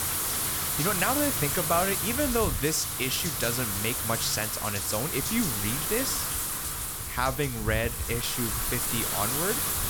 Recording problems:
wind noise on the microphone; heavy; 1 dB below the speech

